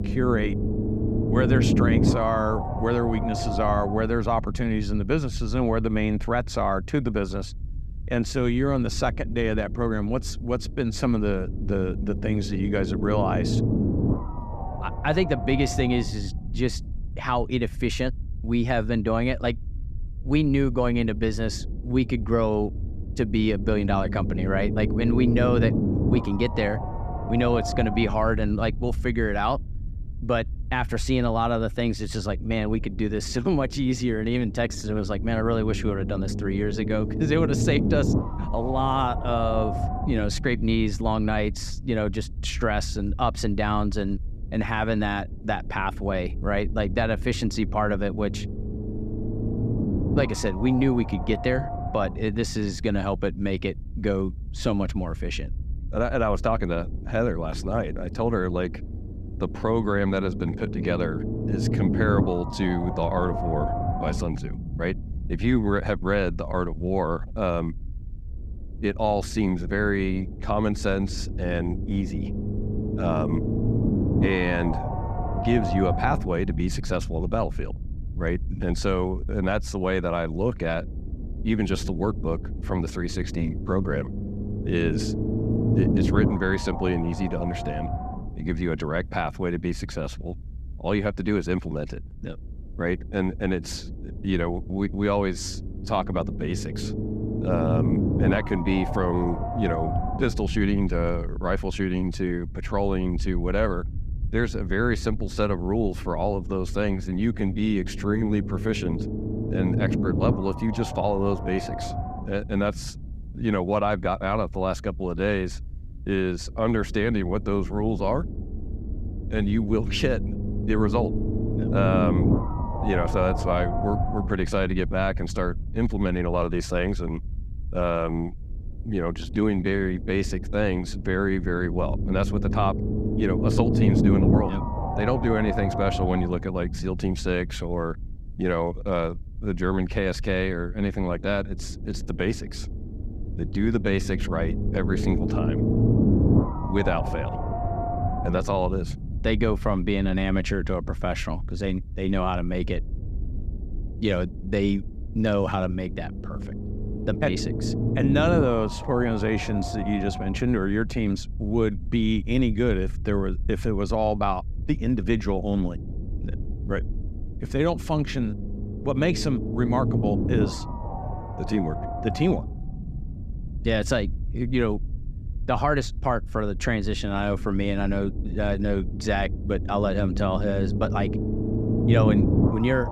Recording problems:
low rumble; loud; throughout; 6 dB below the speech

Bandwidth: 14.5 kHz